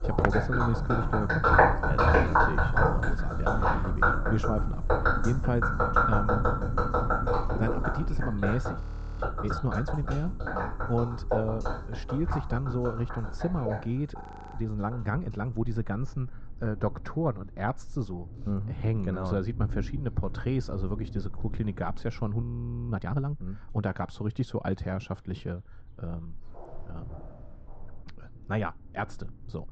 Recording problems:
high frequencies cut off; noticeable; nothing above 8 kHz
muffled; very slightly; fading above 1.5 kHz
rain or running water; very loud; throughout; 4 dB above the speech
animal sounds; faint; throughout; 25 dB below the speech
footsteps; loud; at the start; peak 3 dB above the speech
footsteps; noticeable; from 4.5 to 8 s; peak 5 dB below the speech
audio freezing; at 9 s, at 14 s and at 22 s
footsteps; faint; from 26 to 28 s; peak 15 dB below the speech

